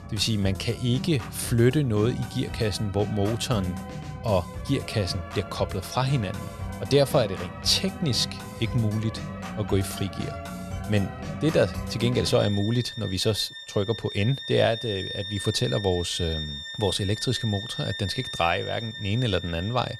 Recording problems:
background music; loud; throughout; 9 dB below the speech

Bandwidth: 13.5 kHz